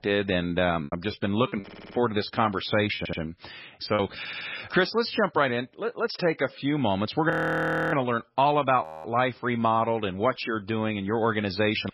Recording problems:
garbled, watery; badly; nothing above 5.5 kHz
choppy; very; from 1 to 4 s; 6% of the speech affected
audio stuttering; at 1.5 s, at 3 s and at 4 s
audio freezing; at 7.5 s for 0.5 s and at 9 s

